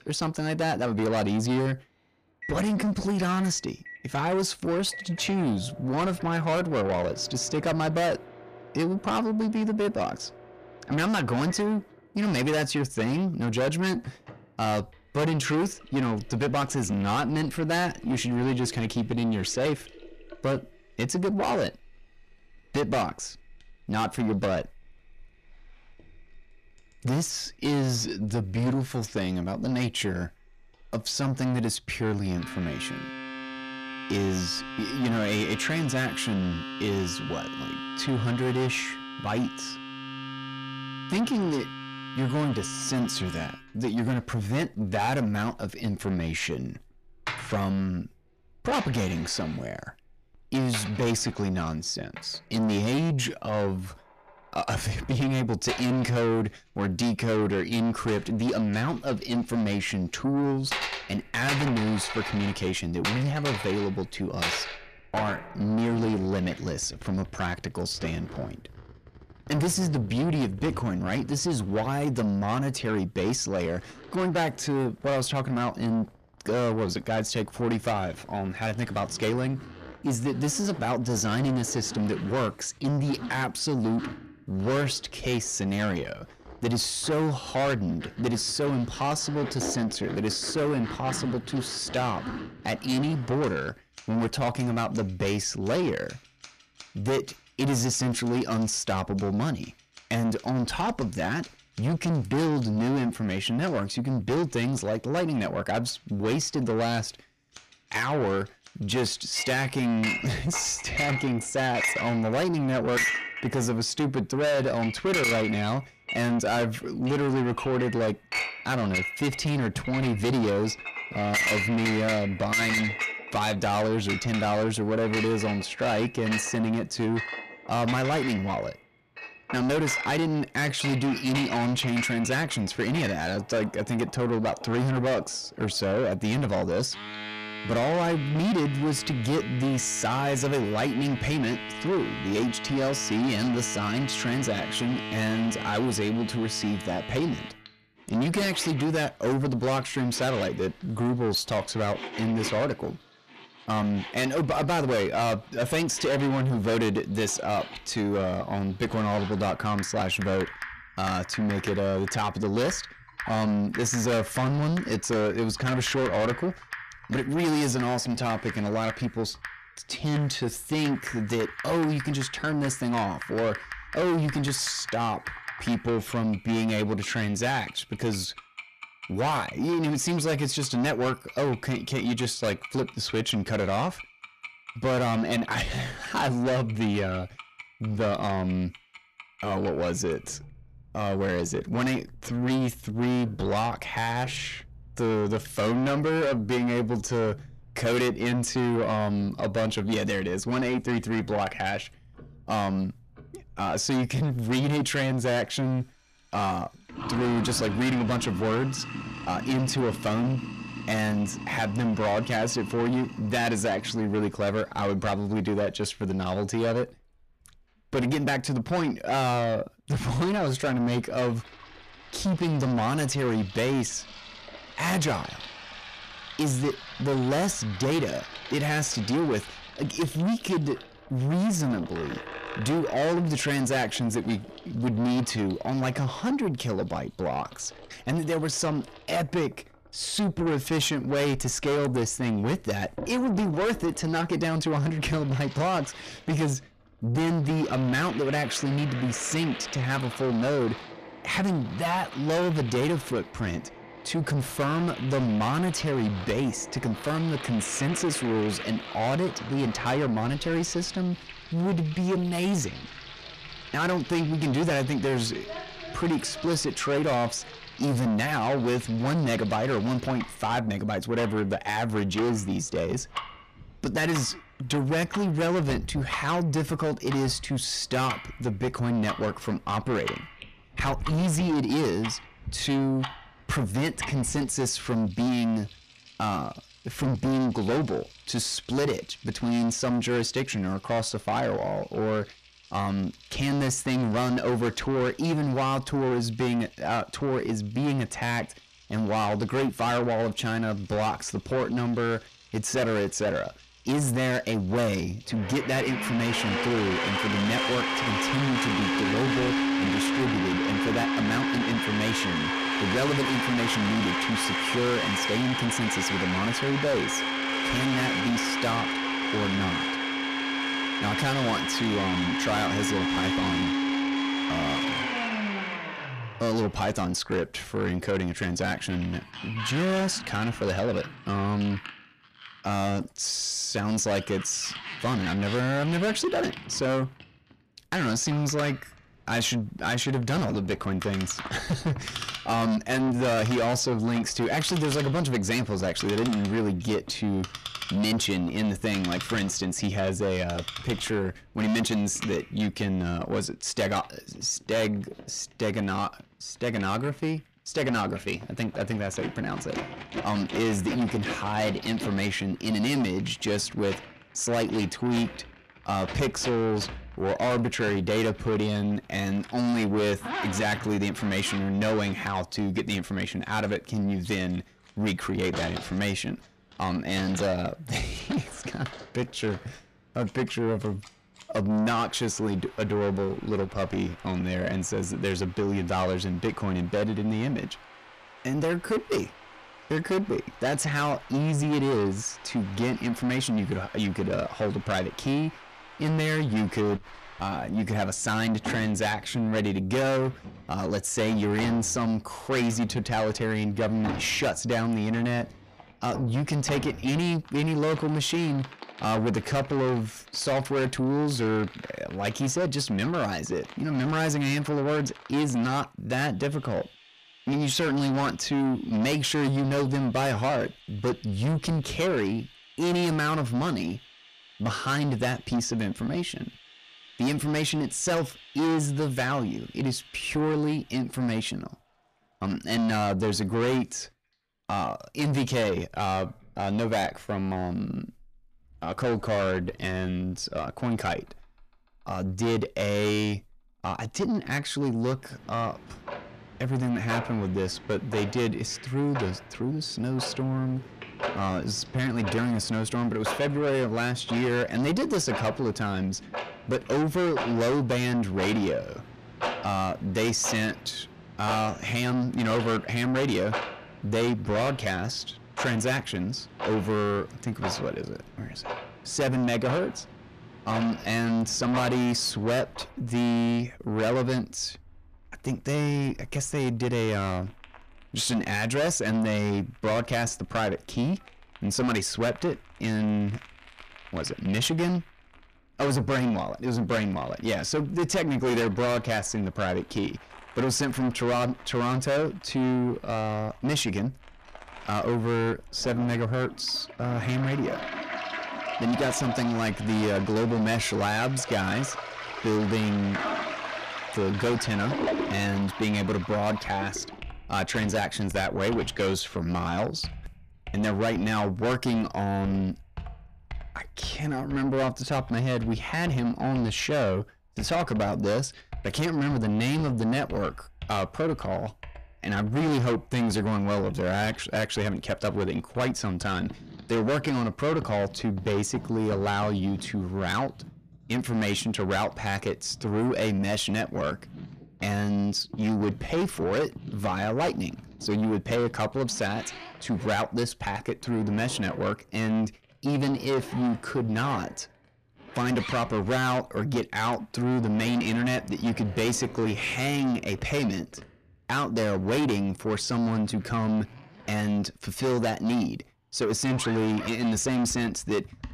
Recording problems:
distortion; heavy; 7 dB below the speech
household noises; loud; throughout; 7 dB below the speech

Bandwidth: 14.5 kHz